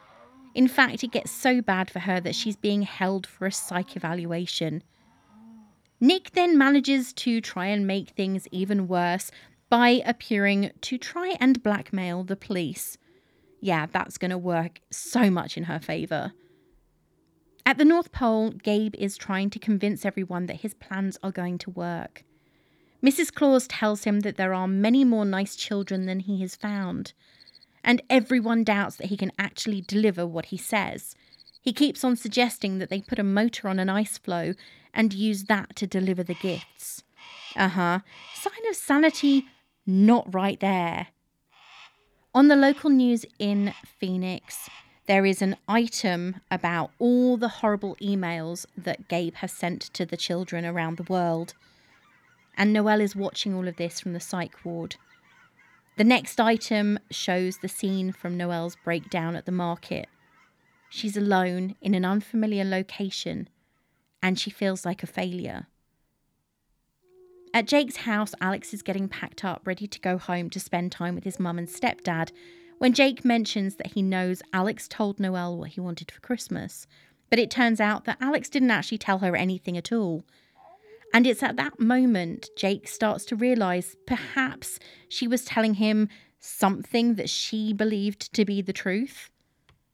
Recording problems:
animal sounds; faint; throughout; 30 dB below the speech

